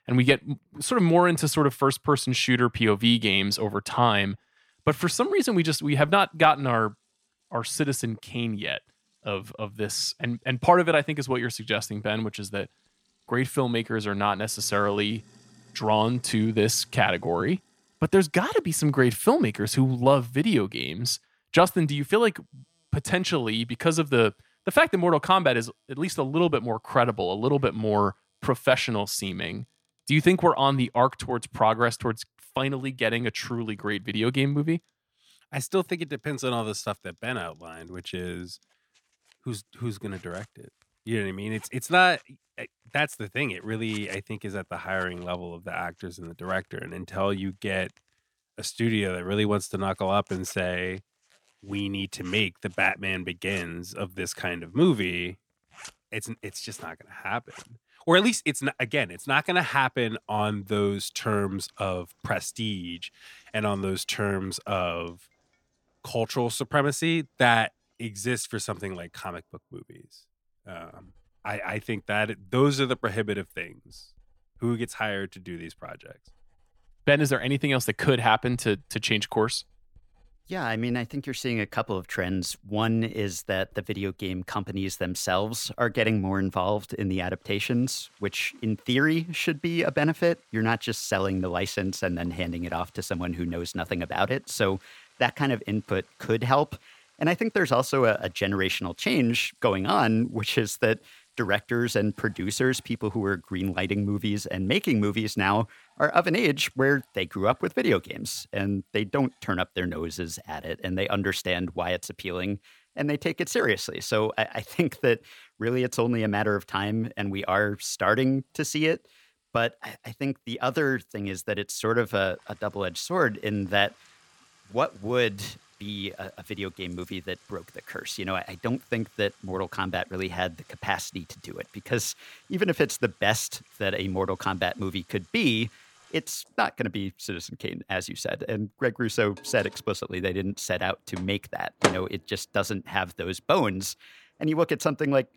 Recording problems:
household noises; noticeable; throughout; 20 dB below the speech

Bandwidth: 17.5 kHz